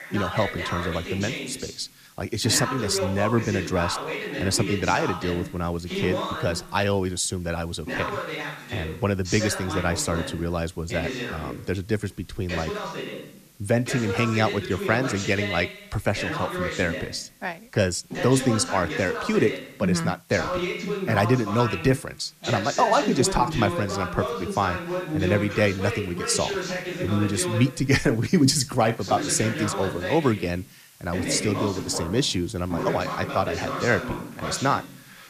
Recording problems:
voice in the background; loud; throughout; 5 dB below the speech
hiss; faint; throughout; 25 dB below the speech

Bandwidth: 14.5 kHz